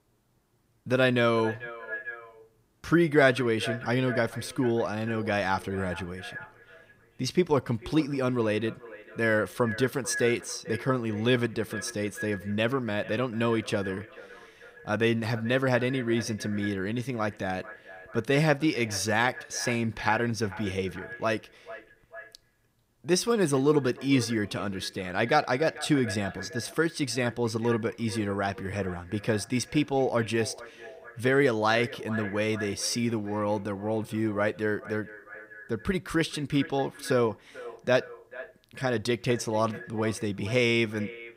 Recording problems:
echo of what is said; noticeable; throughout; 440 ms later, 15 dB below the speech

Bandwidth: 15.5 kHz